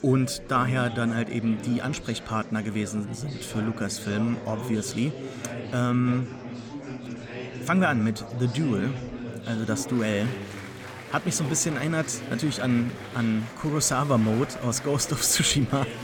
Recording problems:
murmuring crowd; noticeable; throughout; 10 dB below the speech

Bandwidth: 17.5 kHz